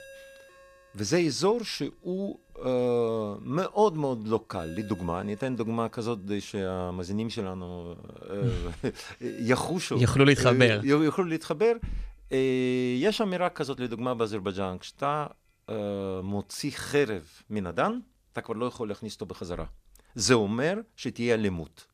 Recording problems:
alarms or sirens; faint; until 17 s; 25 dB below the speech

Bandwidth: 14.5 kHz